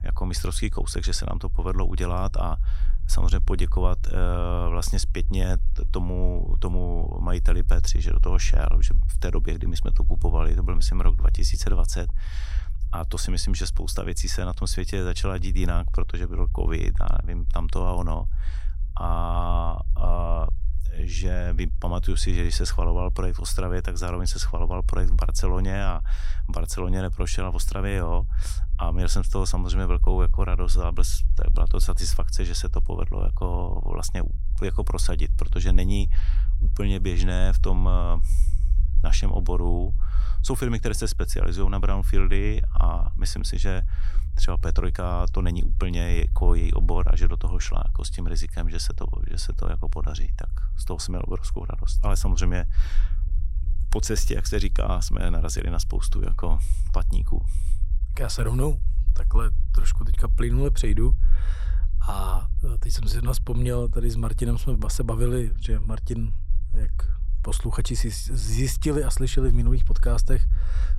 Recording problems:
low rumble; noticeable; throughout; 20 dB below the speech

